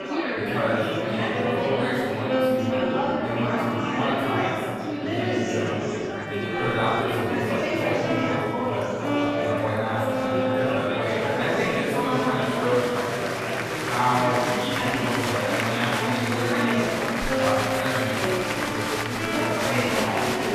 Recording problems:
room echo; strong; dies away in 2.3 s
off-mic speech; far
murmuring crowd; very loud; throughout; 1 dB above the speech
background music; loud; throughout; 3 dB below the speech

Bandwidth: 14.5 kHz